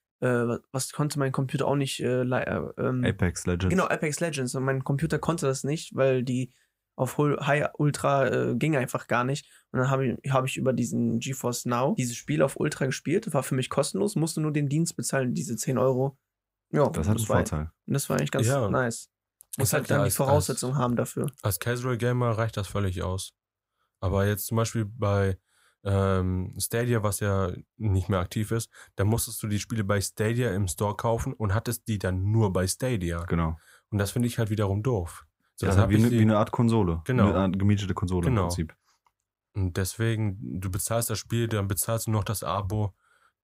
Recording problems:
none

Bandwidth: 15.5 kHz